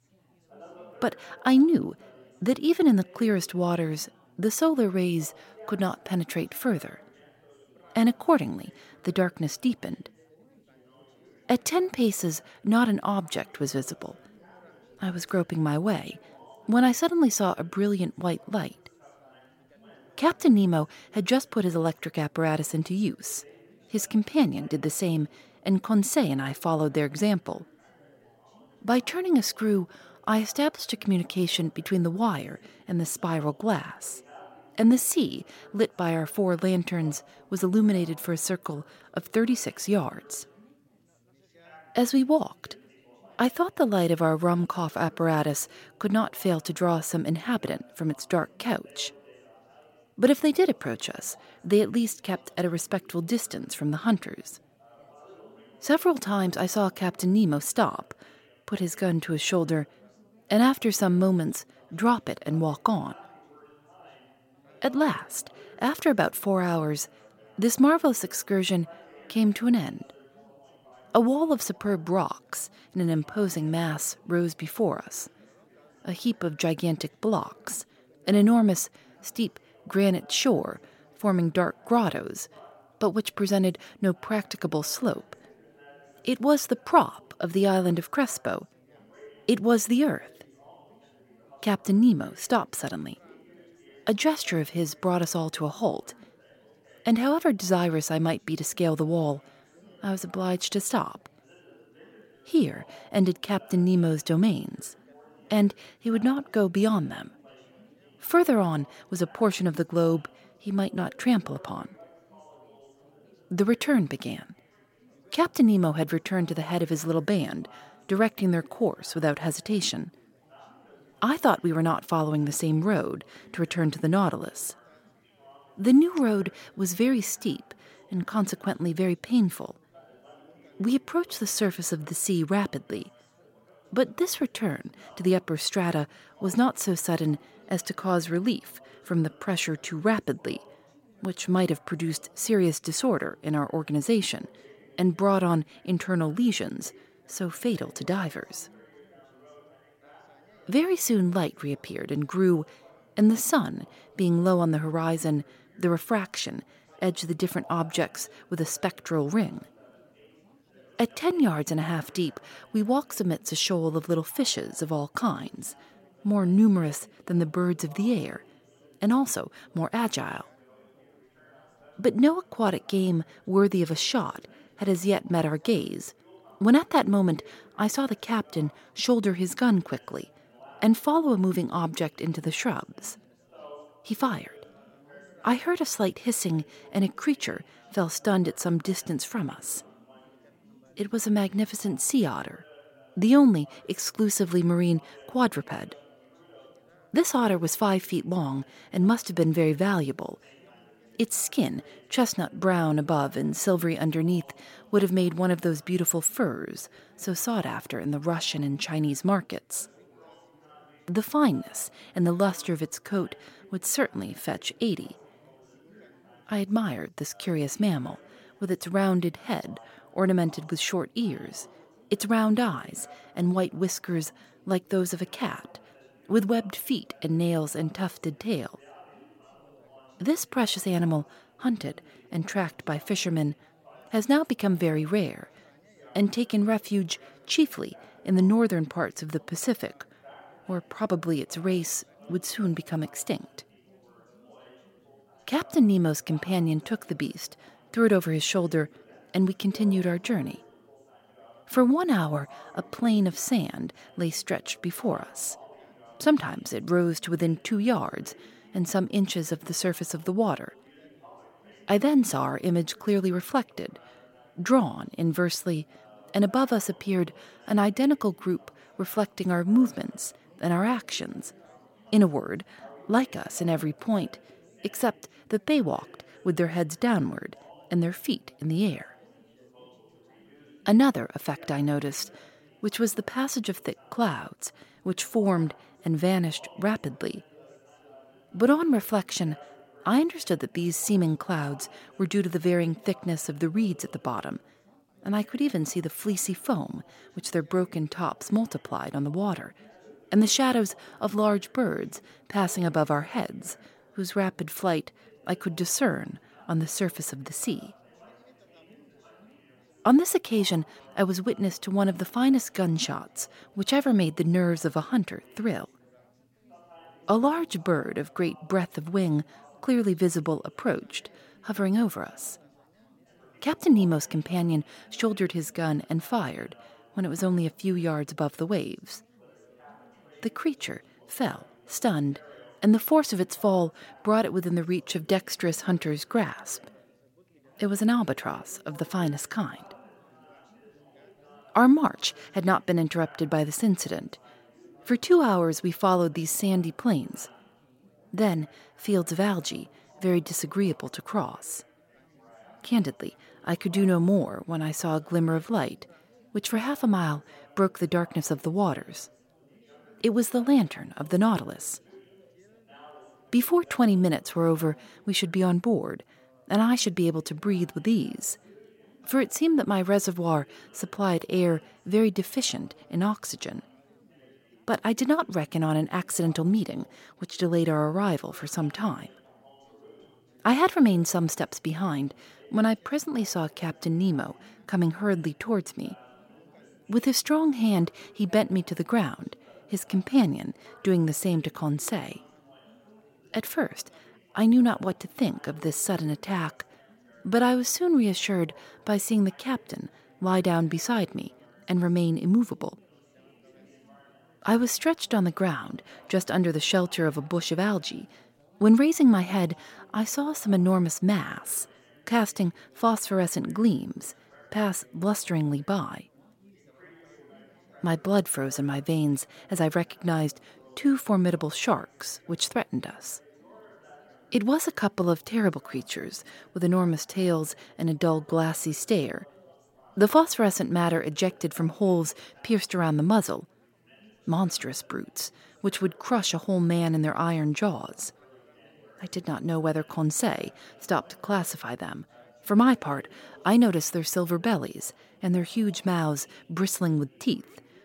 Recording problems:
background chatter; faint; throughout; 4 voices, 30 dB below the speech

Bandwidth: 16.5 kHz